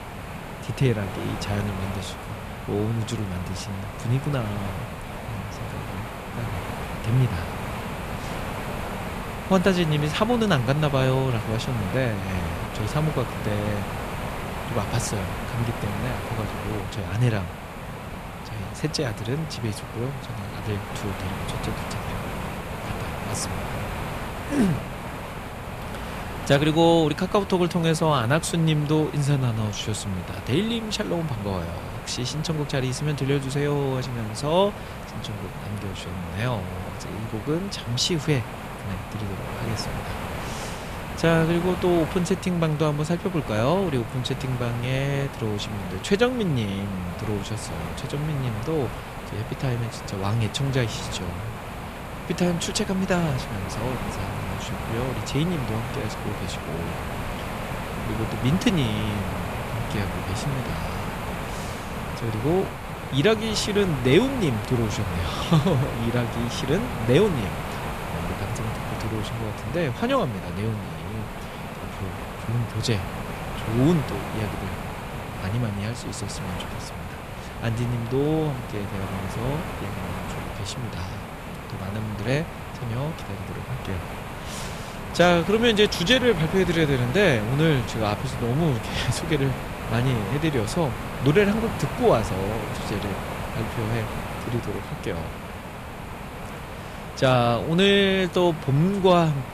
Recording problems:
hiss; loud; throughout; 7 dB below the speech

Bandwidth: 14.5 kHz